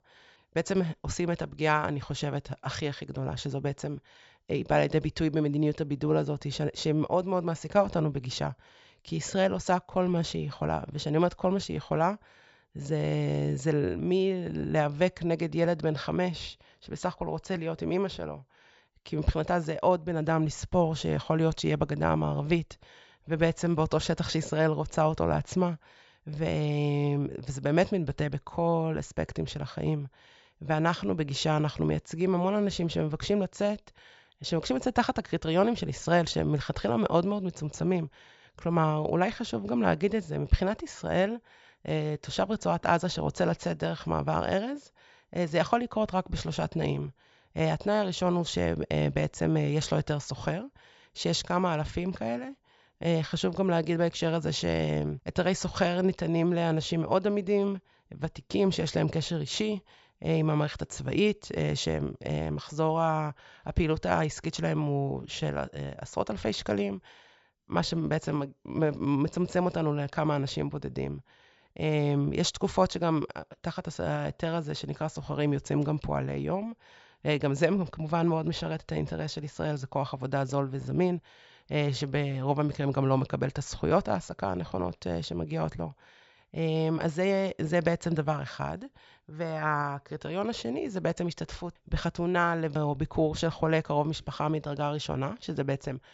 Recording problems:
high frequencies cut off; noticeable; nothing above 8 kHz

